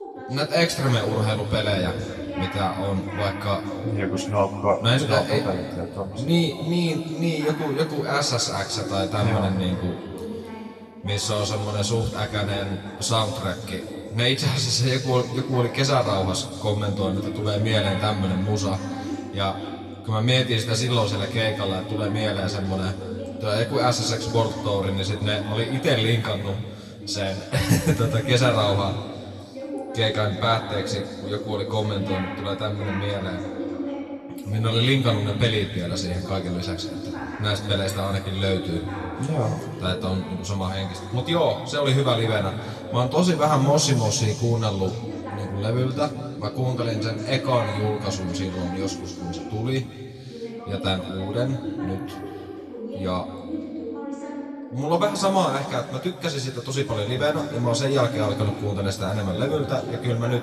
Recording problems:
room echo; slight; dies away in 2.1 s
off-mic speech; somewhat distant
voice in the background; loud; throughout; 10 dB below the speech

